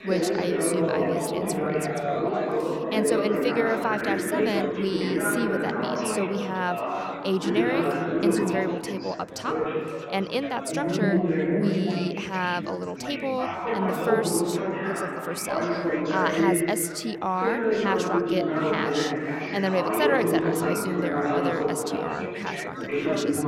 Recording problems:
chatter from many people; very loud; throughout; 3 dB above the speech

